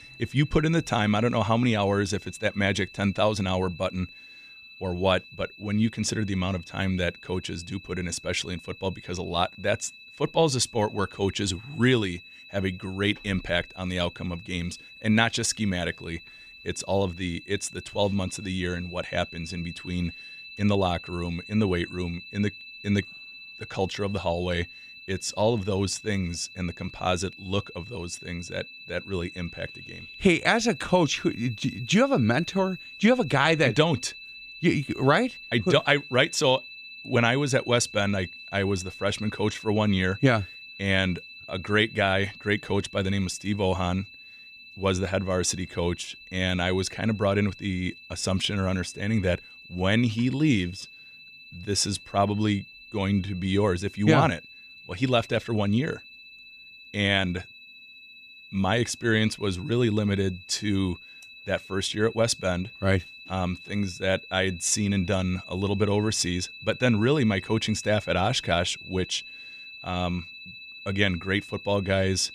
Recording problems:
high-pitched whine; noticeable; throughout; 2.5 kHz, 15 dB below the speech

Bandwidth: 14.5 kHz